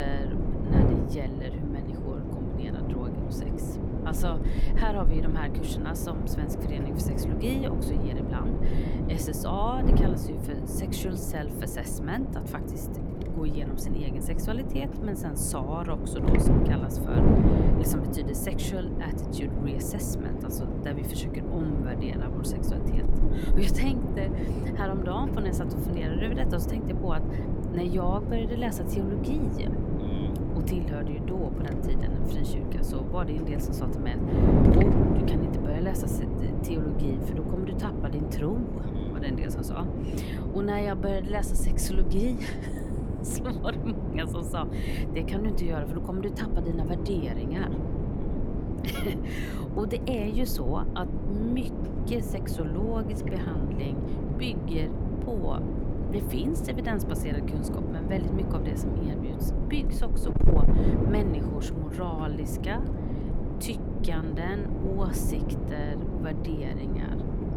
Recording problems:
wind noise on the microphone; heavy; 1 dB above the speech
abrupt cut into speech; at the start

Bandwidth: 17.5 kHz